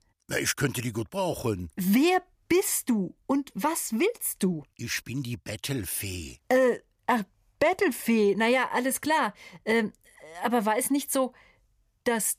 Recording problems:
none

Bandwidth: 15 kHz